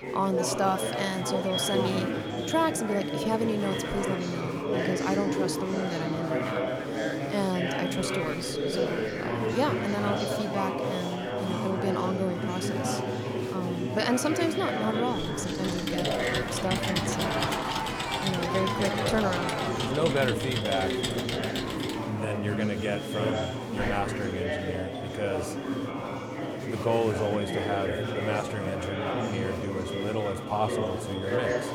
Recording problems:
echo of what is said; strong; throughout; 260 ms later, 10 dB below the speech
chatter from many people; very loud; throughout; 1 dB above the speech
keyboard typing; loud; from 15 to 22 s; peak 1 dB above the speech
doorbell; faint; from 25 to 26 s; peak 15 dB below the speech

